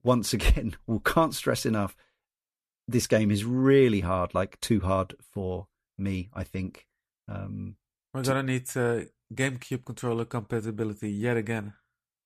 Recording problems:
none

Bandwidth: 14.5 kHz